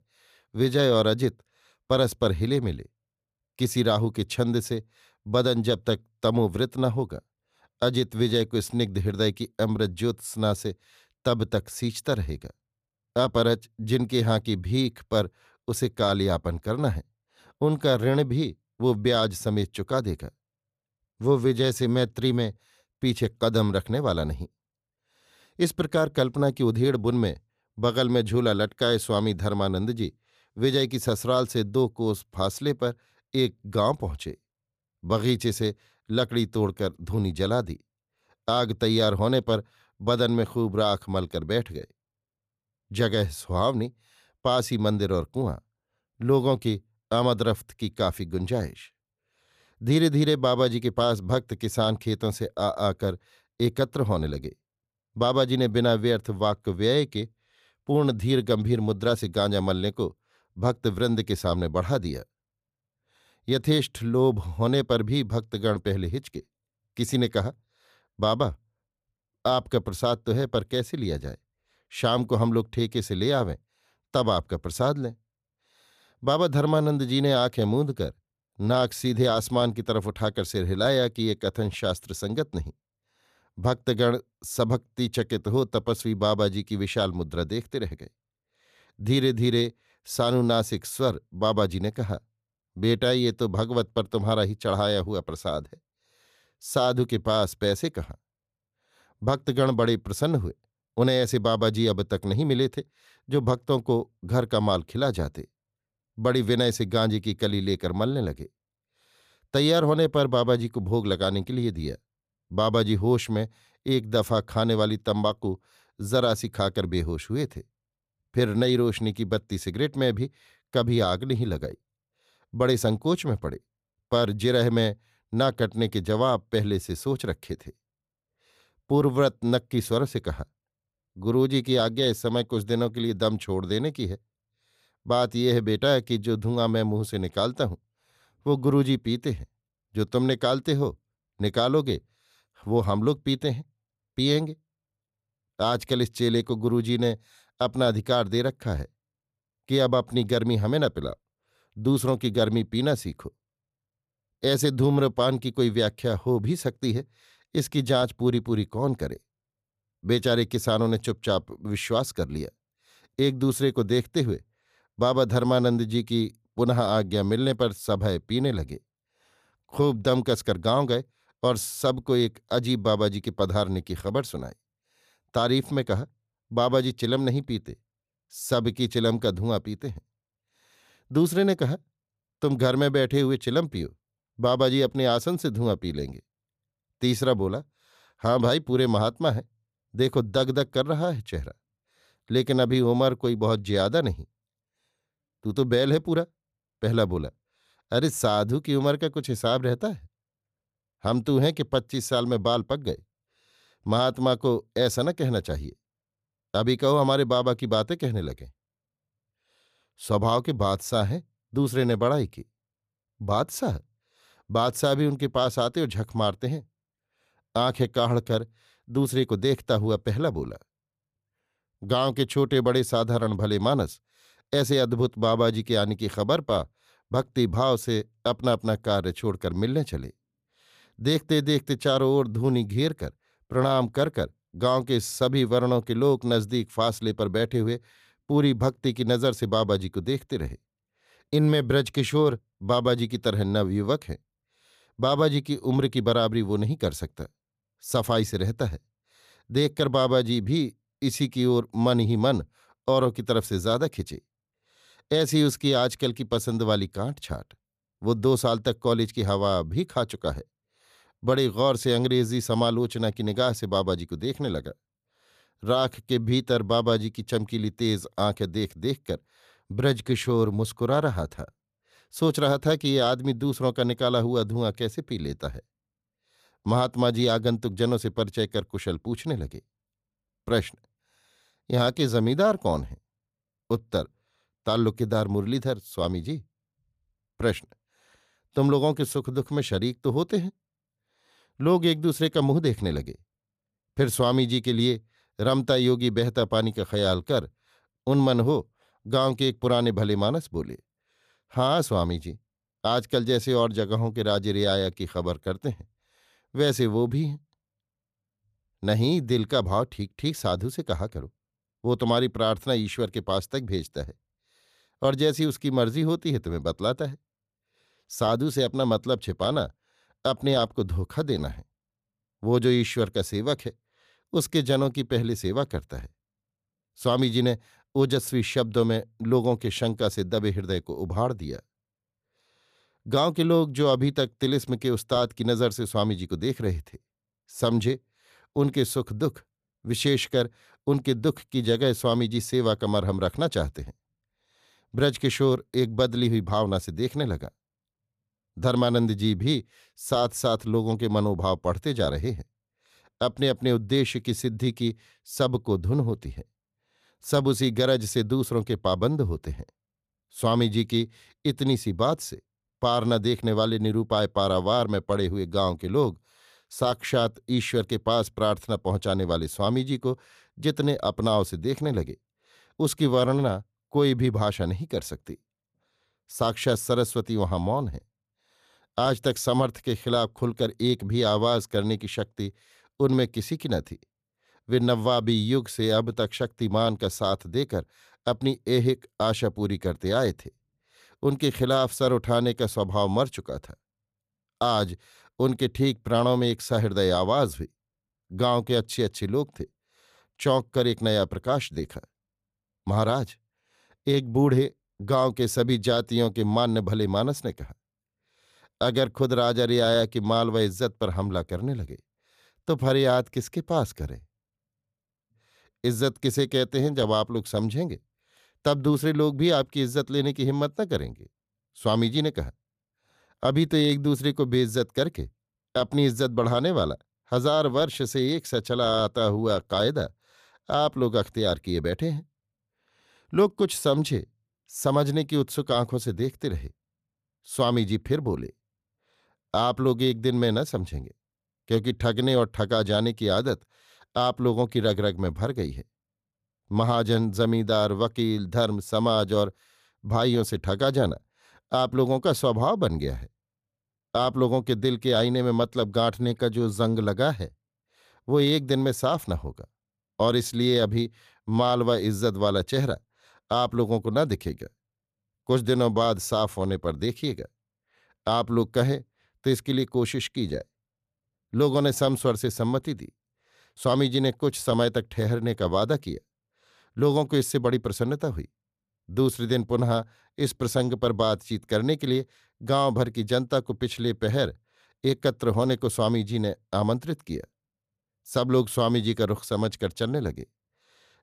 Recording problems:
none

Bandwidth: 14.5 kHz